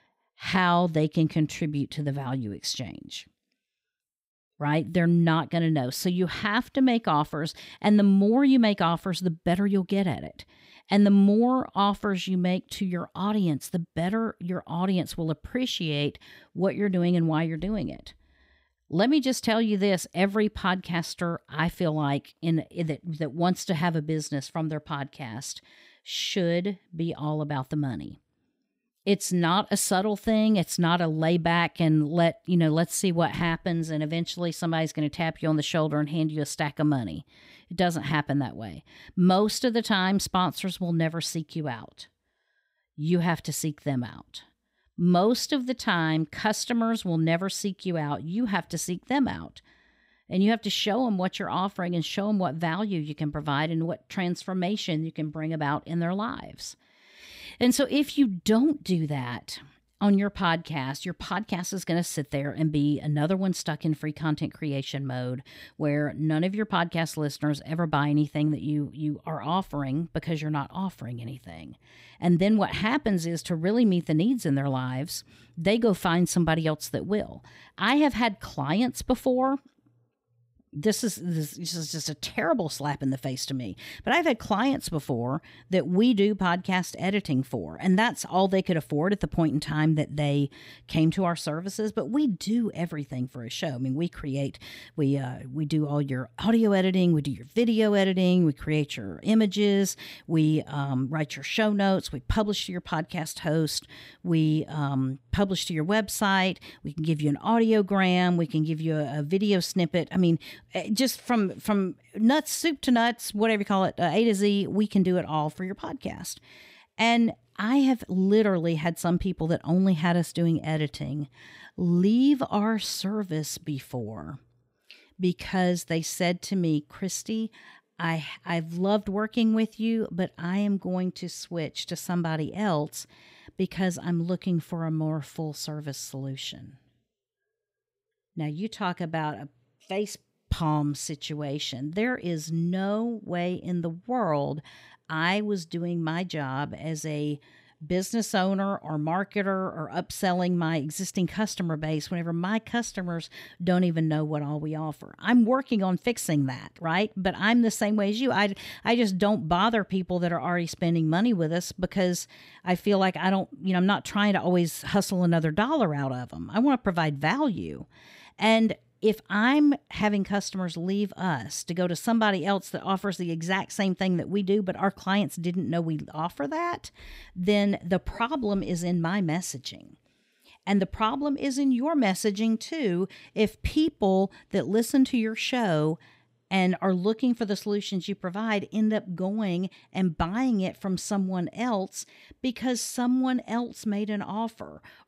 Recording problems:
none

